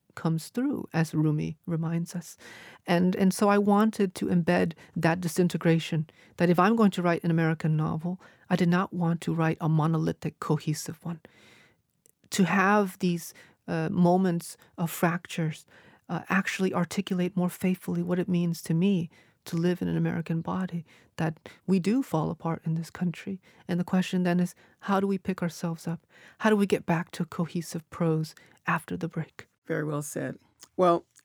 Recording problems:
none

